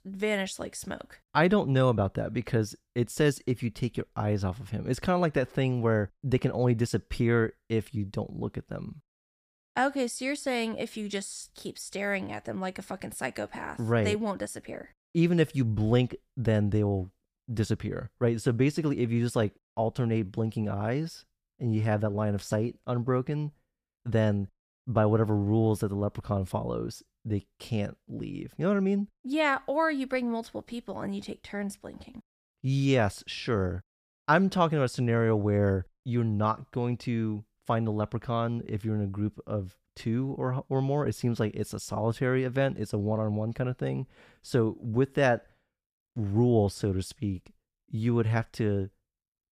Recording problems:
none

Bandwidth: 15 kHz